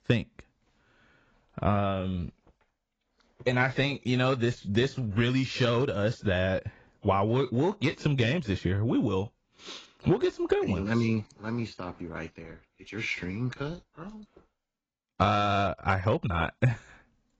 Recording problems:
garbled, watery; badly; nothing above 7.5 kHz

